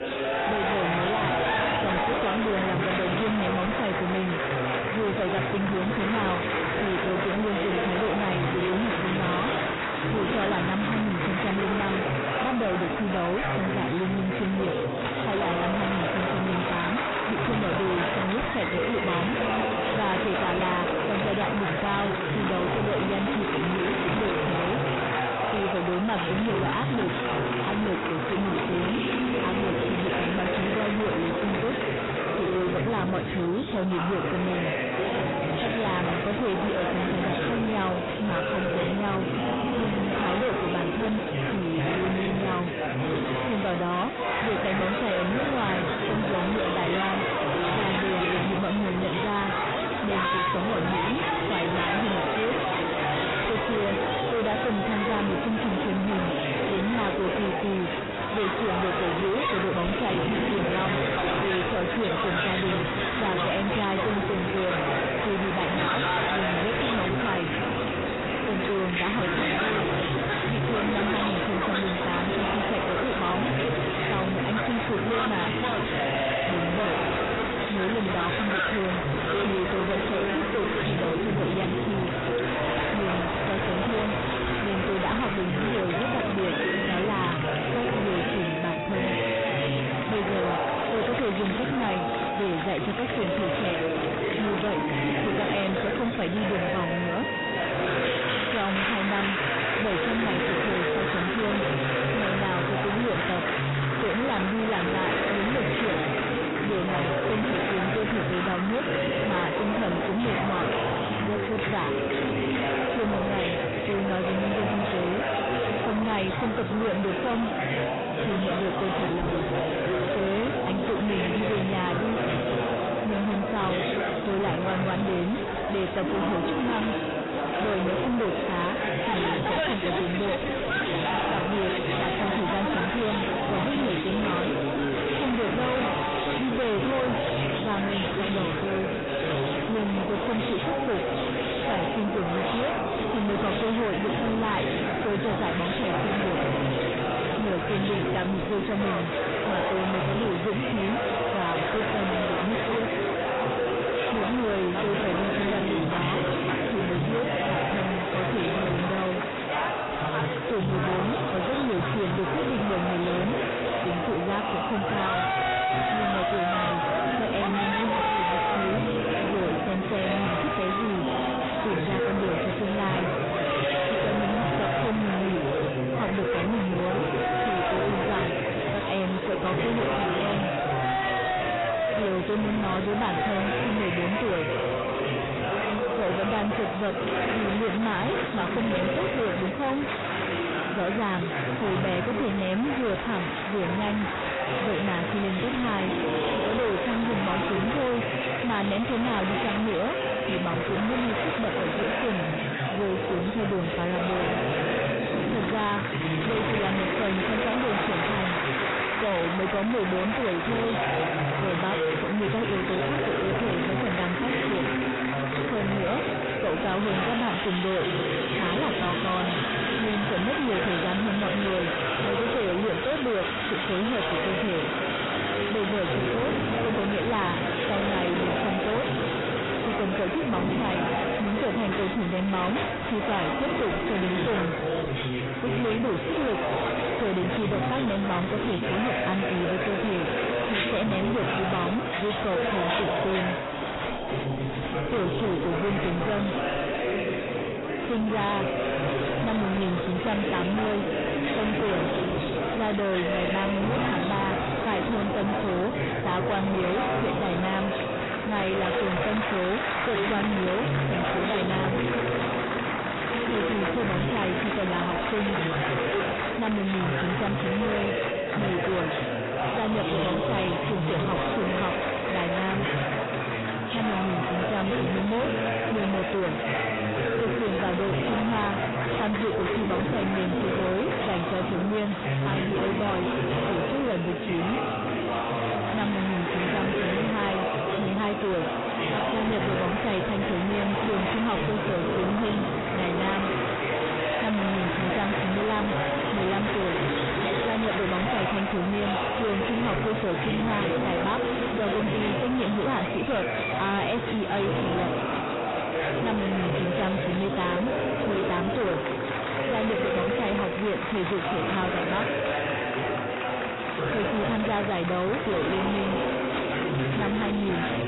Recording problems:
distortion; heavy; 7 dB below the speech
garbled, watery; badly; nothing above 4 kHz
chatter from many people; very loud; throughout; 1 dB above the speech

